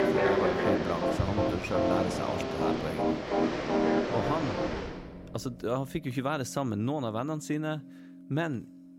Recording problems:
animal sounds; very loud; until 5 s; as loud as the speech
background music; very loud; throughout; 2 dB above the speech

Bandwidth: 16 kHz